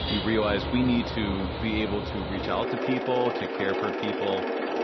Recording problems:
garbled, watery; slightly; nothing above 6 kHz
machinery noise; loud; throughout; 2 dB below the speech
background music; faint; throughout; 25 dB below the speech

